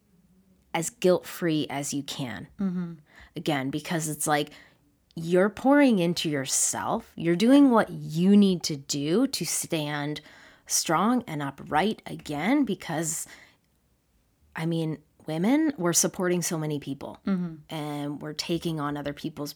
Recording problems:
none

